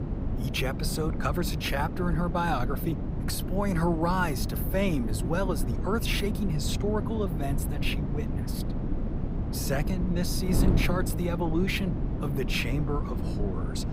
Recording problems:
wind noise on the microphone; heavy; 8 dB below the speech

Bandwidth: 15.5 kHz